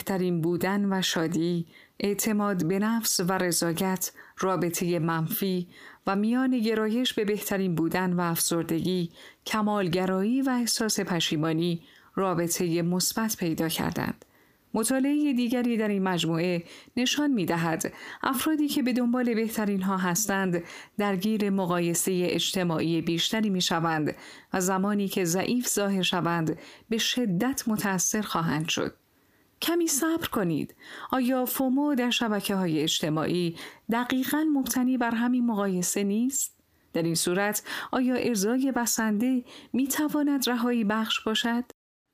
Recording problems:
squashed, flat; heavily

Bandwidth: 15 kHz